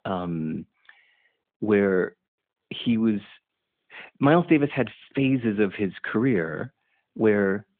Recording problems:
phone-call audio

